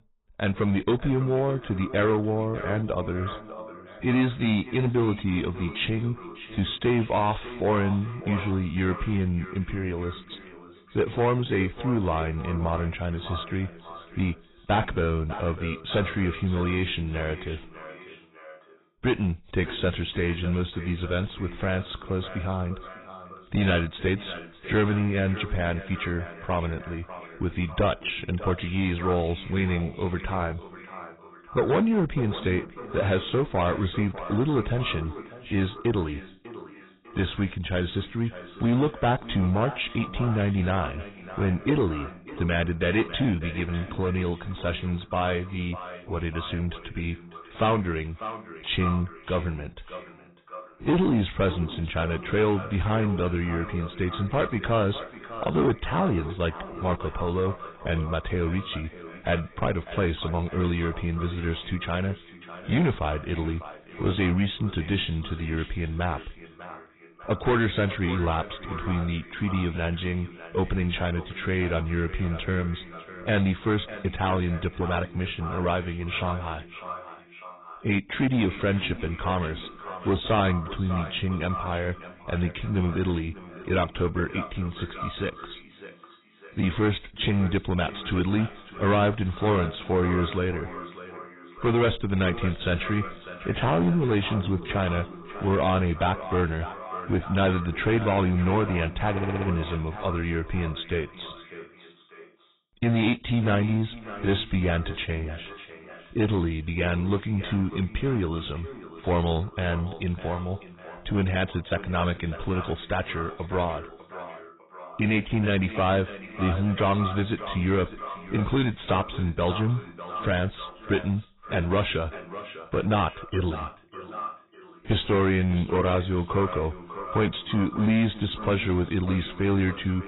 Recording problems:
garbled, watery; badly; nothing above 4 kHz
echo of what is said; noticeable; throughout; 600 ms later, 15 dB below the speech
distortion; slight; 4% of the sound clipped
audio stuttering; at 1:39

